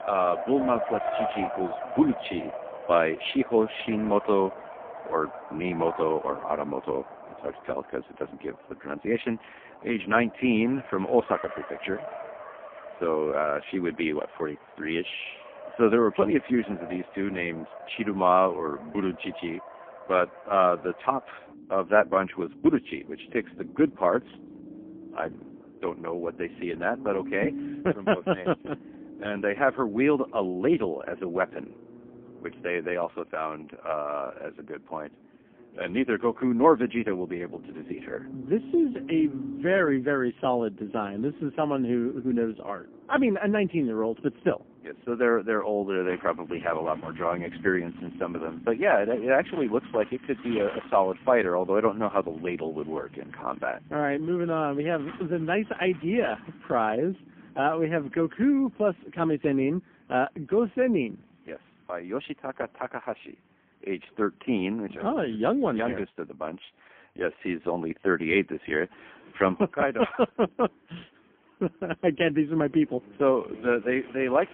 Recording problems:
phone-call audio; poor line; nothing above 3.5 kHz
traffic noise; noticeable; throughout; 15 dB below the speech

